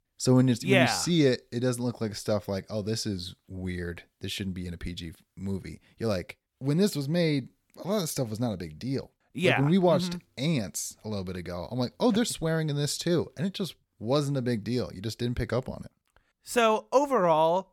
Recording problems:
none

